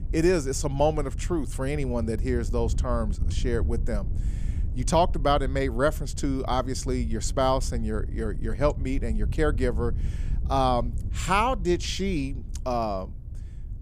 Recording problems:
wind noise on the microphone; occasional gusts; 20 dB below the speech

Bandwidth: 15 kHz